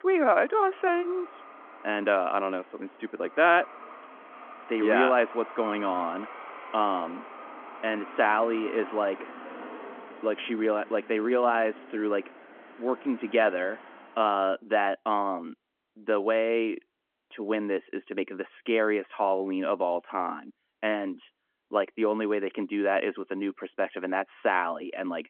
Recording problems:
phone-call audio
traffic noise; noticeable; until 14 s; 15 dB below the speech

